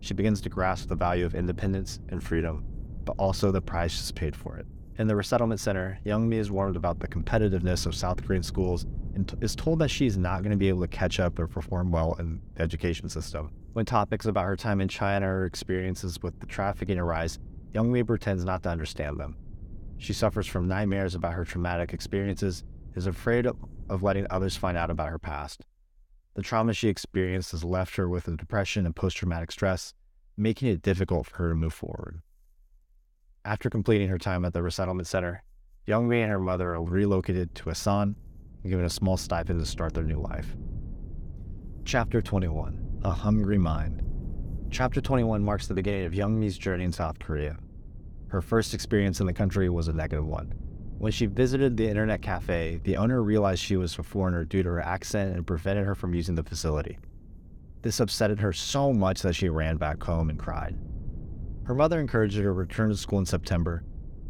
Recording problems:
low rumble; faint; until 25 s and from 36 s on; 25 dB below the speech

